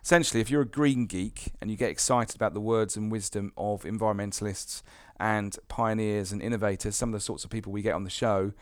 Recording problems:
none

